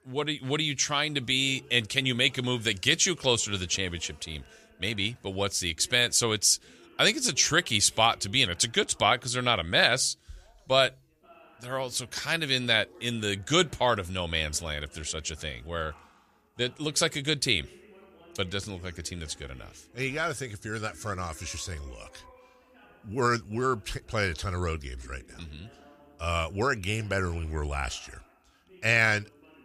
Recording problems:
background chatter; faint; throughout; 2 voices, 30 dB below the speech

